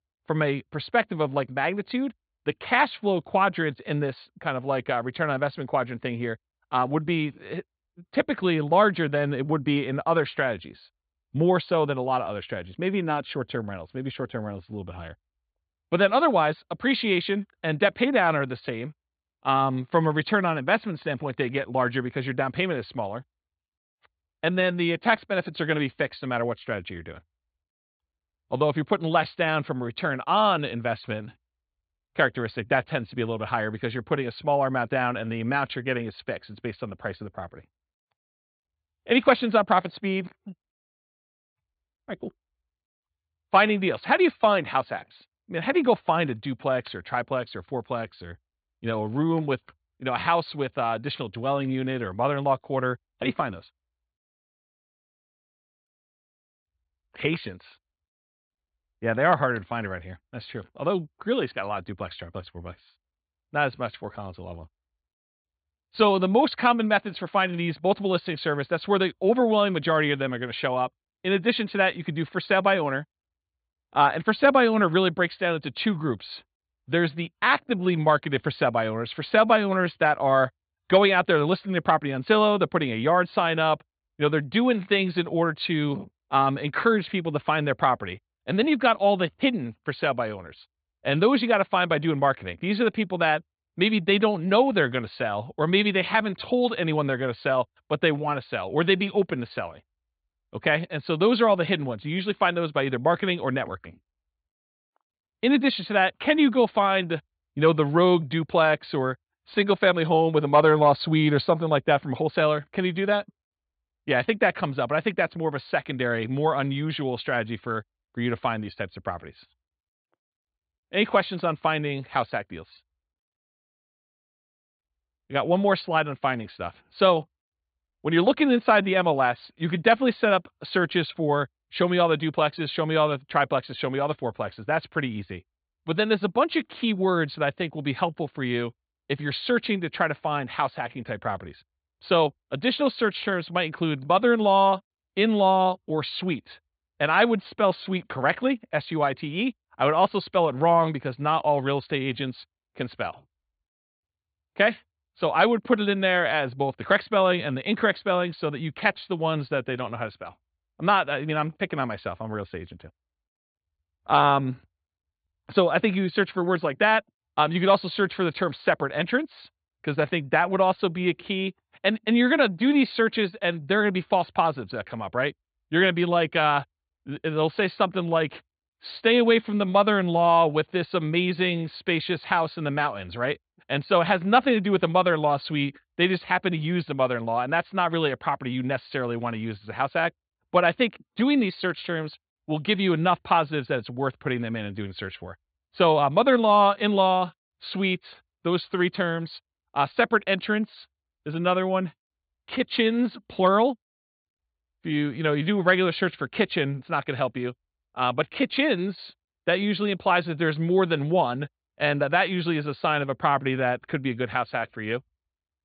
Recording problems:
high frequencies cut off; severe; nothing above 4.5 kHz

